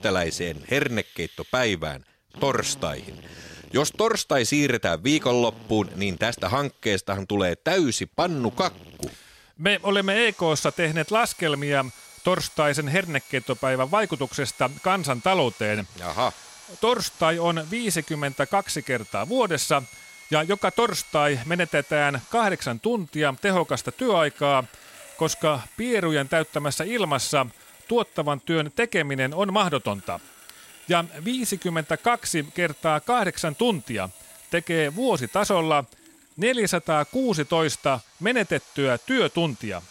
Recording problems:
machinery noise; faint; throughout; 20 dB below the speech

